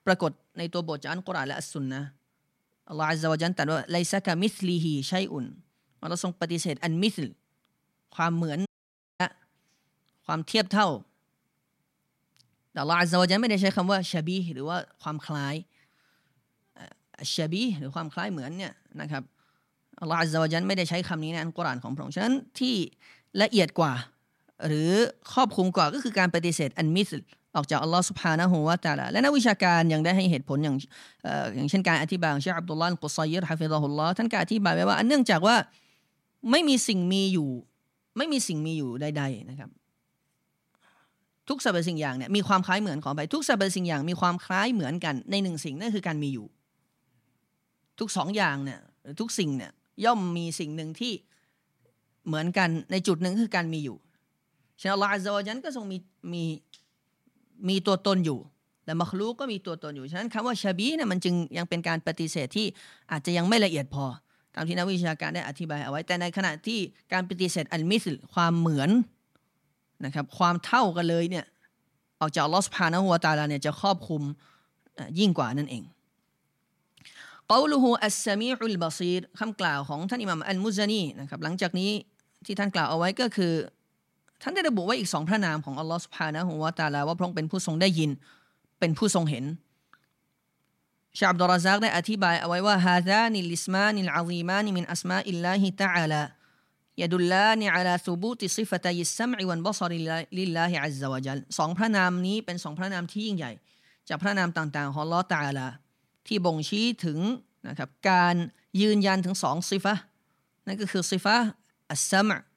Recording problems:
audio cutting out; at 8.5 s for 0.5 s

